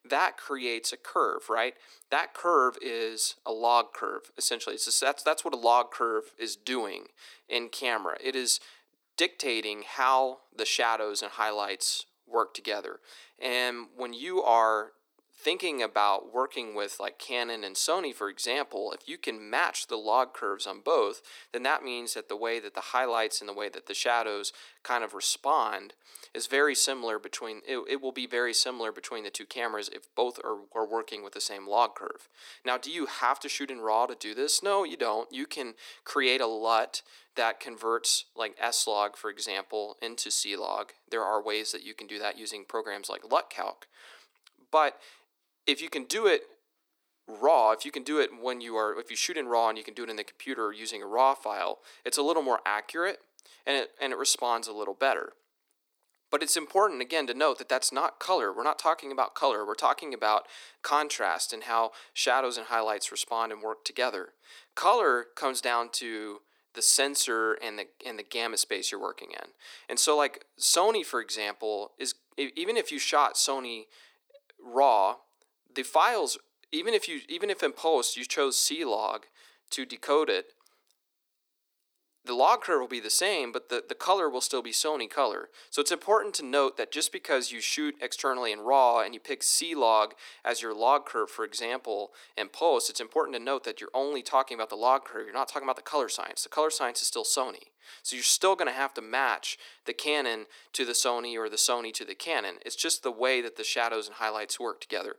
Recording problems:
thin; somewhat; fading below 300 Hz

